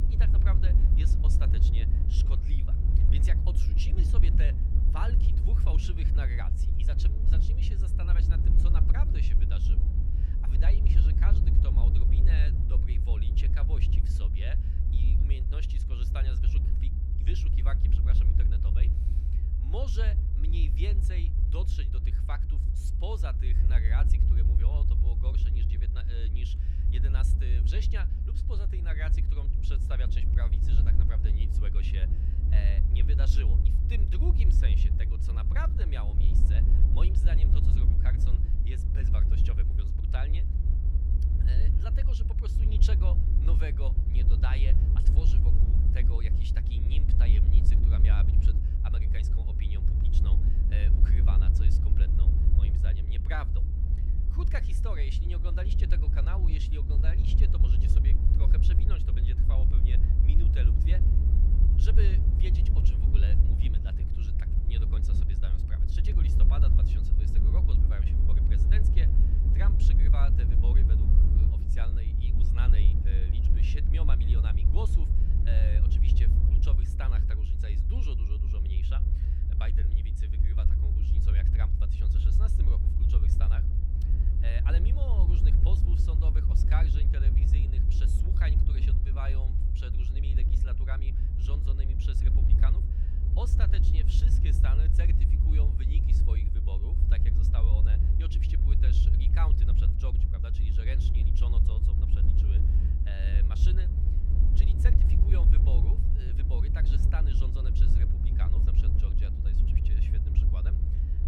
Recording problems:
low rumble; loud; throughout; as loud as the speech

